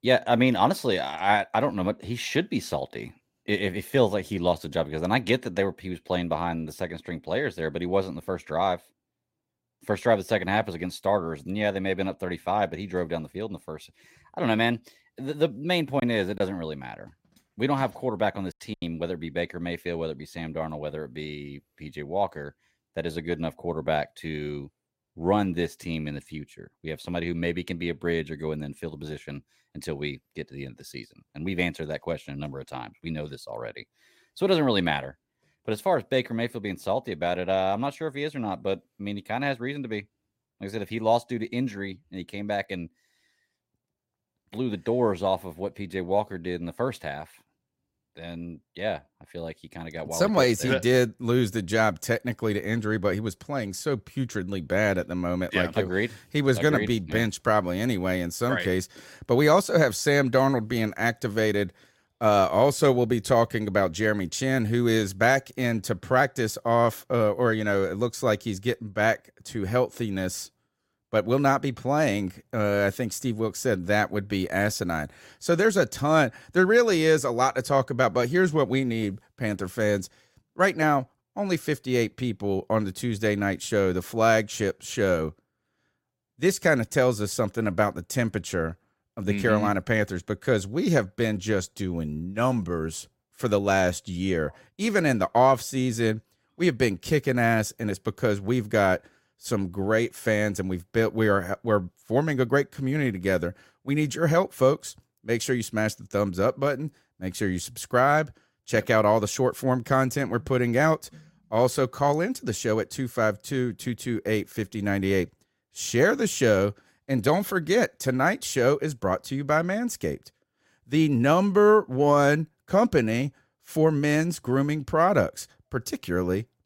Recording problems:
choppy; occasionally; from 16 to 19 s; 3% of the speech affected

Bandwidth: 16 kHz